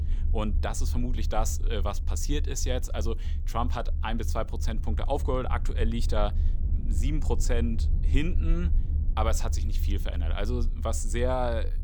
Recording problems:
low rumble; noticeable; throughout; 15 dB below the speech

